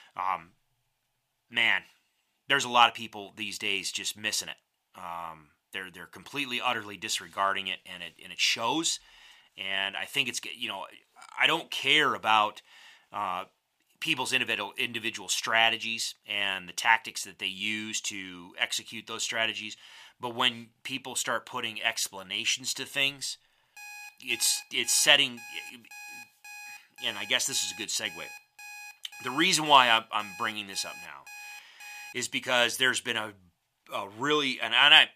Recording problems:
thin; somewhat; fading below 750 Hz
alarm; faint; from 24 to 32 s; peak 15 dB below the speech

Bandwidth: 15 kHz